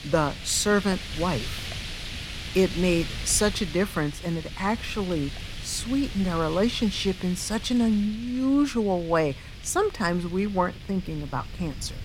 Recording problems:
wind noise on the microphone; heavy; 10 dB below the speech

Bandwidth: 16 kHz